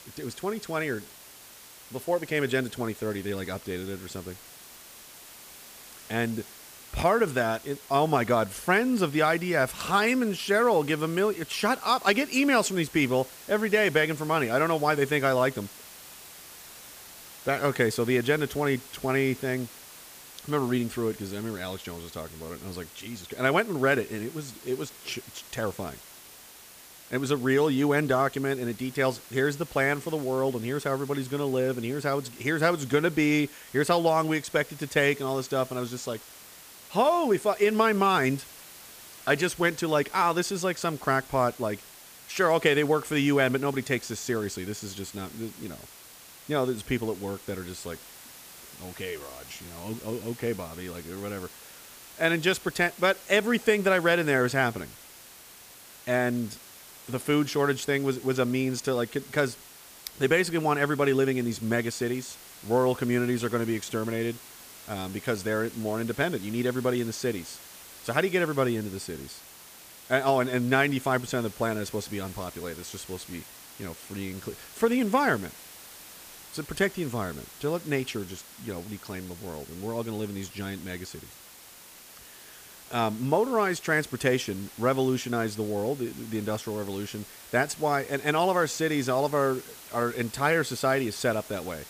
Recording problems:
hiss; noticeable; throughout; 20 dB below the speech

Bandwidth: 15 kHz